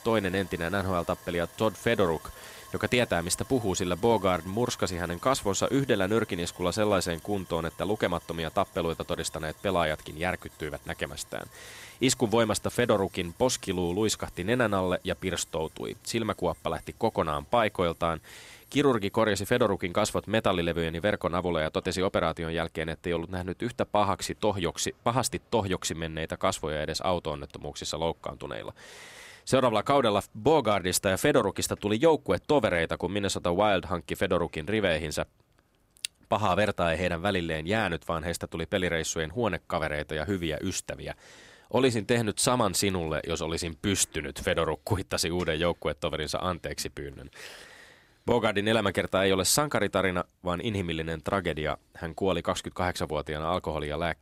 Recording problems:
machinery noise; faint; throughout; 25 dB below the speech

